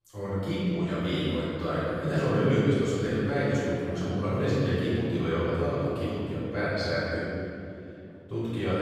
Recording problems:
room echo; strong; dies away in 2.7 s
off-mic speech; far
abrupt cut into speech; at the end

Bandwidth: 15 kHz